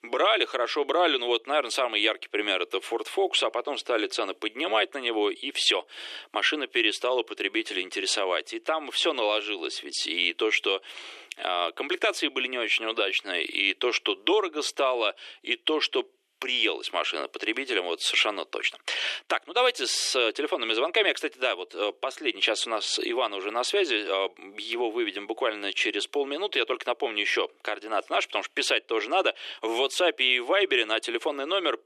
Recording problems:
thin; very; fading below 350 Hz

